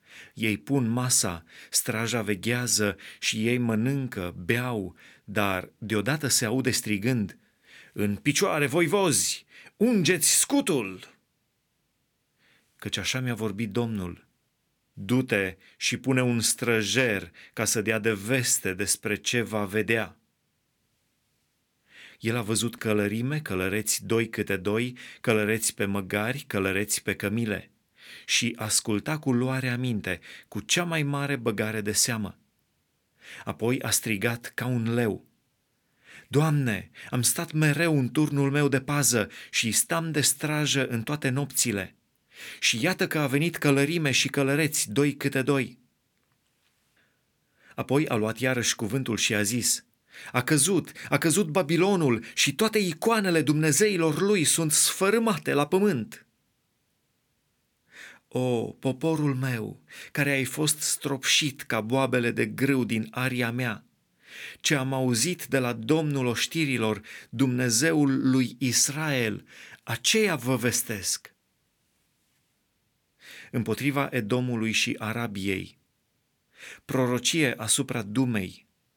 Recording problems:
none

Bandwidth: 18.5 kHz